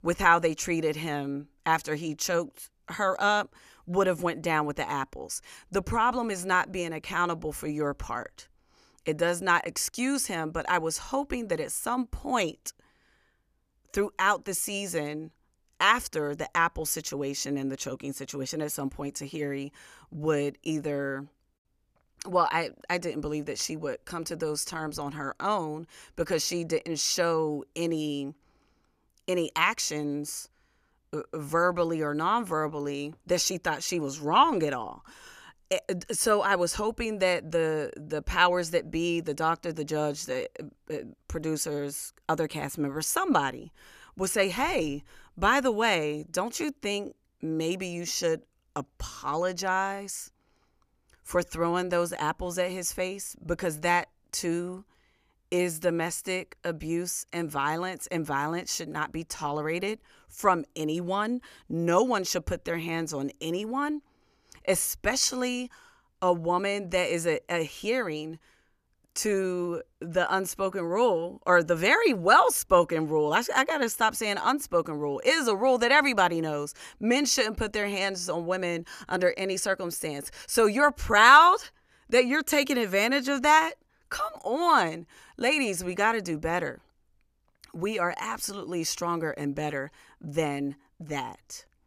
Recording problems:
none

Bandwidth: 14.5 kHz